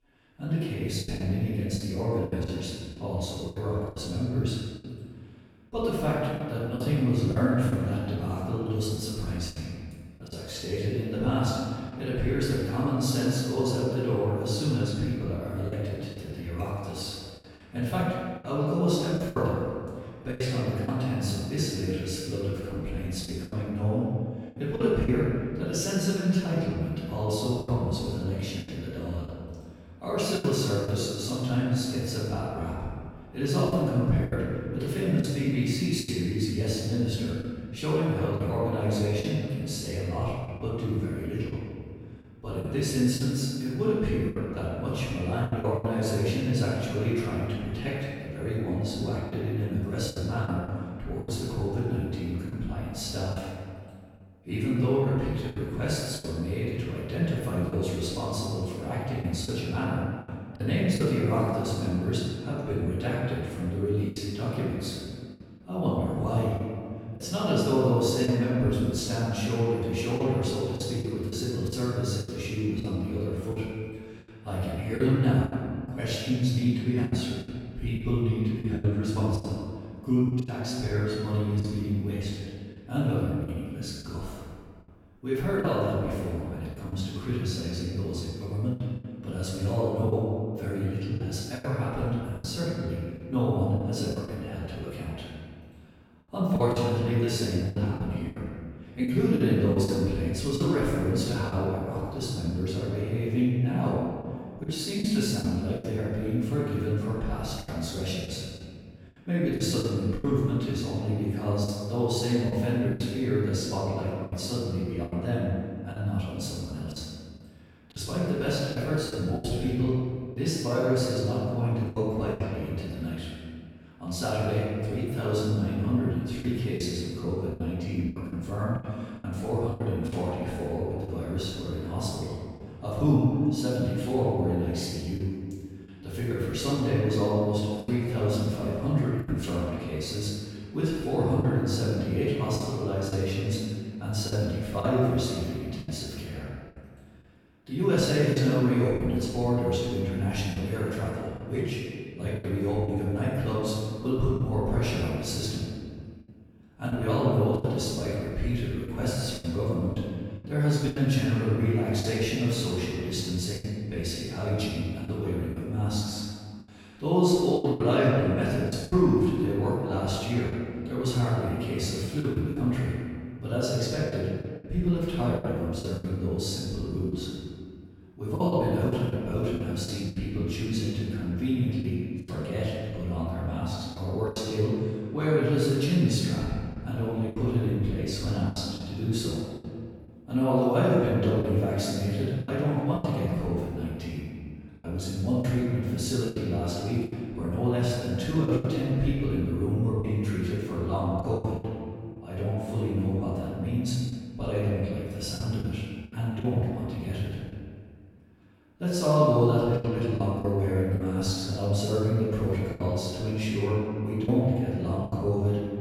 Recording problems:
room echo; strong; dies away in 1.8 s
off-mic speech; far
choppy; very; 6% of the speech affected

